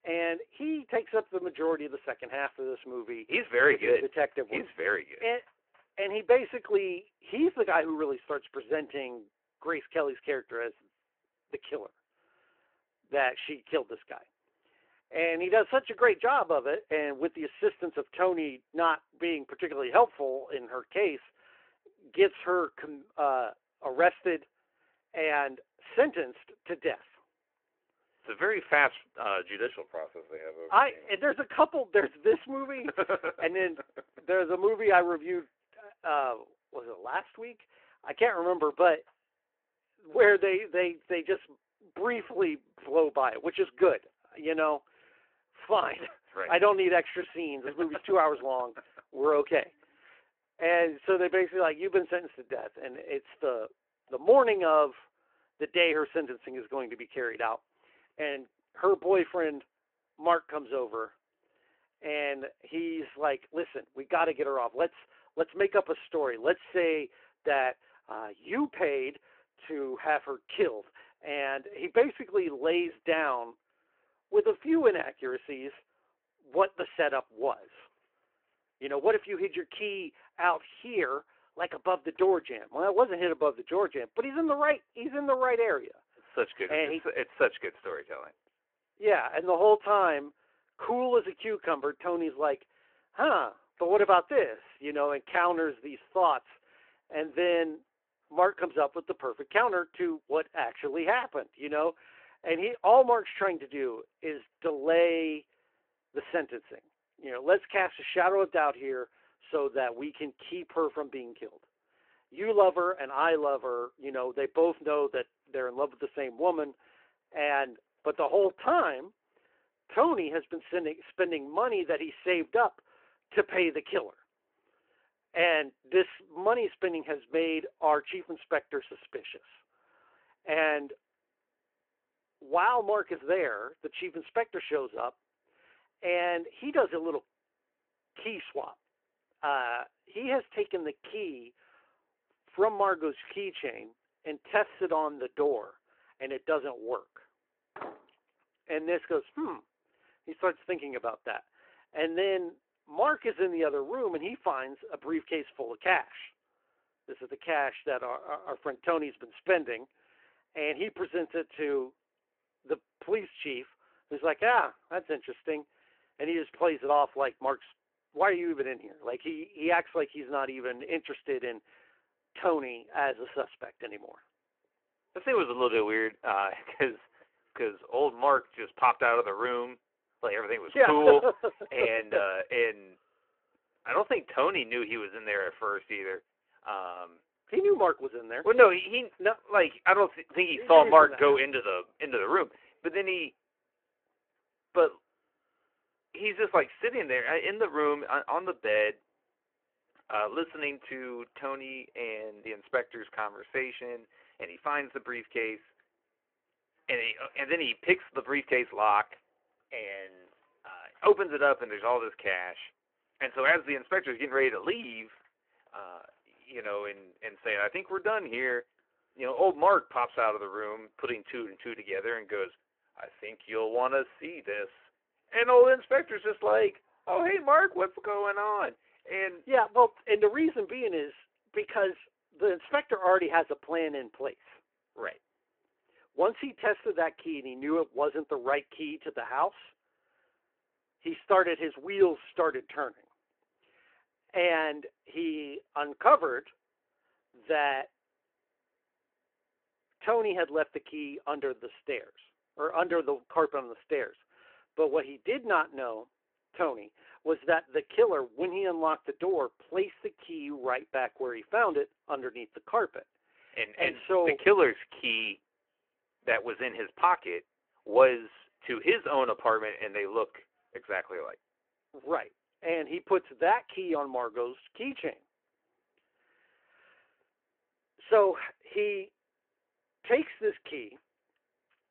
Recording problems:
phone-call audio
door banging; faint; at 2:28; peak 15 dB below the speech

